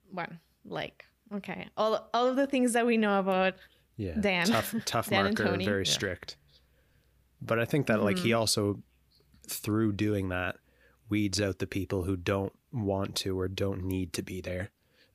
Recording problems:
none

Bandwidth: 15 kHz